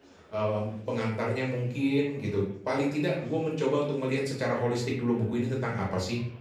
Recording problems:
off-mic speech; far
room echo; slight; dies away in 0.5 s
murmuring crowd; faint; throughout; 25 dB below the speech

